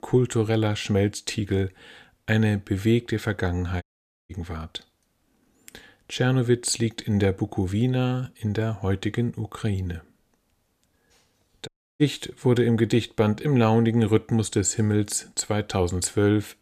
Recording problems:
audio cutting out; at 4 s and at 12 s

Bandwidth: 14.5 kHz